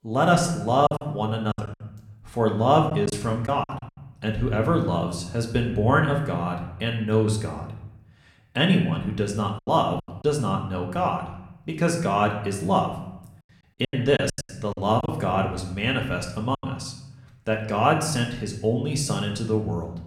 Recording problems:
room echo; slight; dies away in 0.7 s
off-mic speech; somewhat distant
choppy; very; from 1 to 3.5 s, at 9.5 s and from 14 to 17 s; 10% of the speech affected

